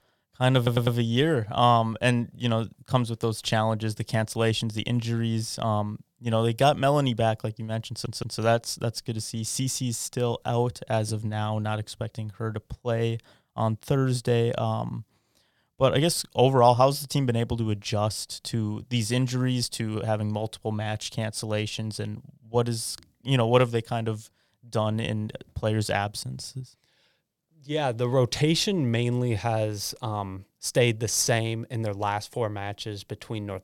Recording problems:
audio stuttering; at 0.5 s and at 8 s

